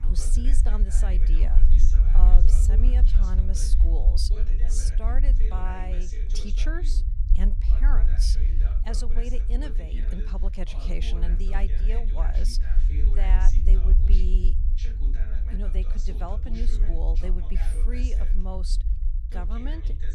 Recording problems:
voice in the background; loud; throughout; 7 dB below the speech
low rumble; loud; throughout; 7 dB below the speech

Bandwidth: 14.5 kHz